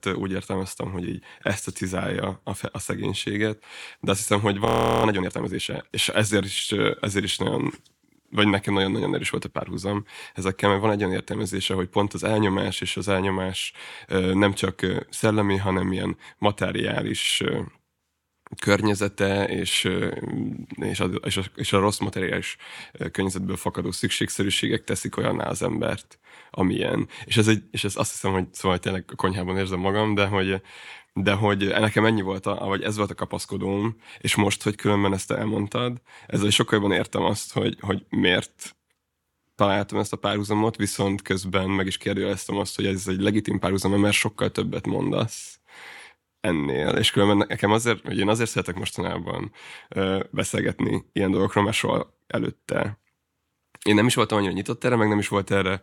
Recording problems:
audio freezing; at 4.5 s

